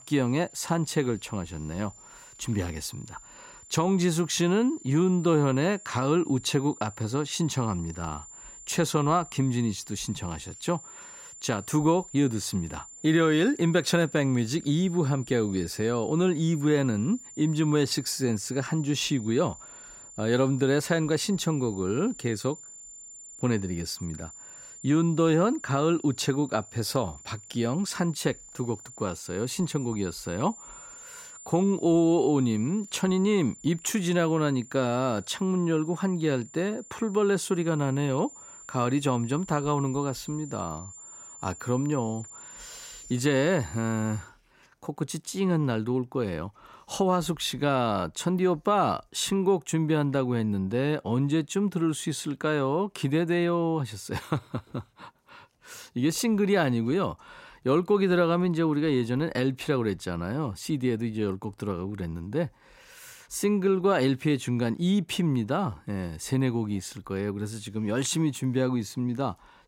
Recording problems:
high-pitched whine; noticeable; until 44 s; 7 kHz, 15 dB below the speech

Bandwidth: 16 kHz